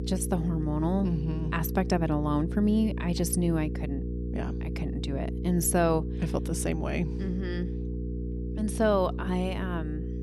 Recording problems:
electrical hum; noticeable; throughout; 60 Hz, 10 dB below the speech

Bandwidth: 14 kHz